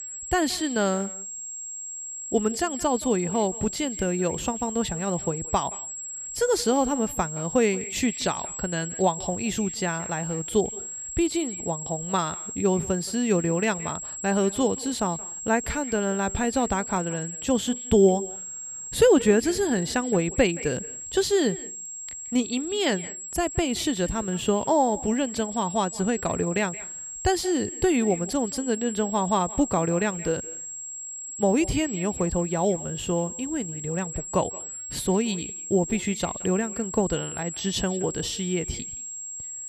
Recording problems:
echo of what is said; faint; throughout; 170 ms later, 20 dB below the speech
high-pitched whine; loud; throughout; 7.5 kHz, 7 dB below the speech

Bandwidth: 15 kHz